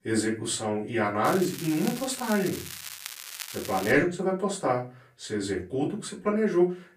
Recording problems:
off-mic speech; far
room echo; slight; dies away in 0.3 s
crackling; noticeable; from 1.5 to 4 s; 10 dB below the speech

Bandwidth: 15 kHz